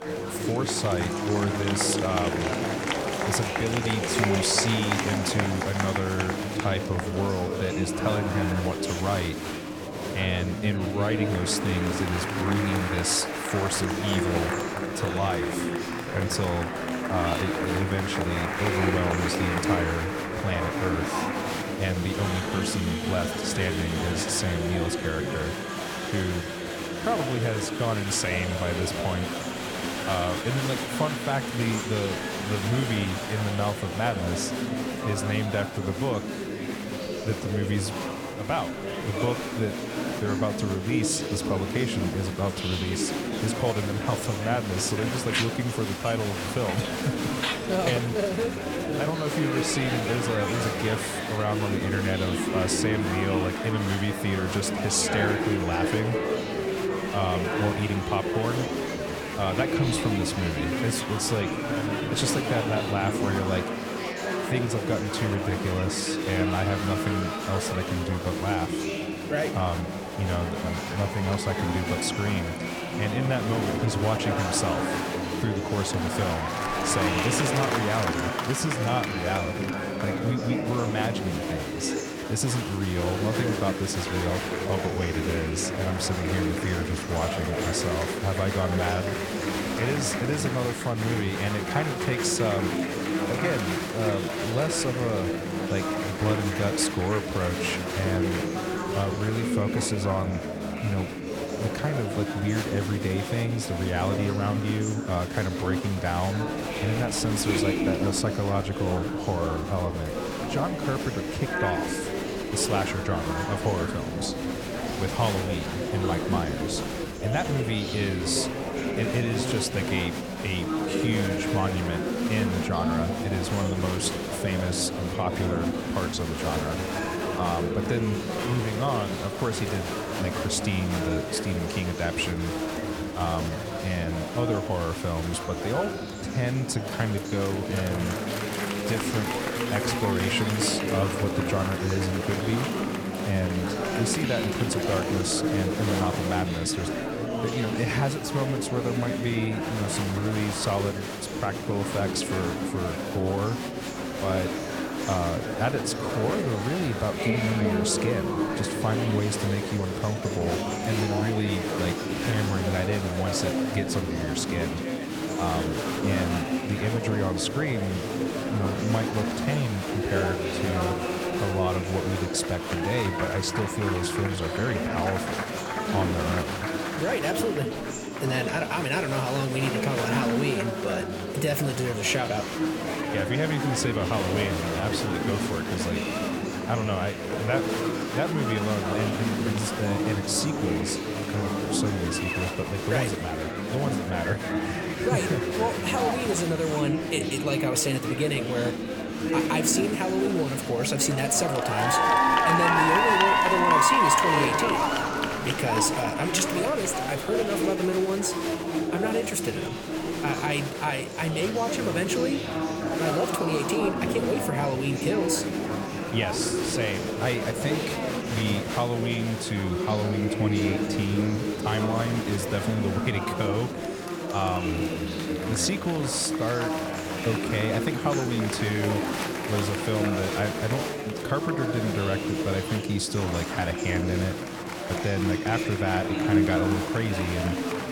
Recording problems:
murmuring crowd; very loud; throughout; as loud as the speech

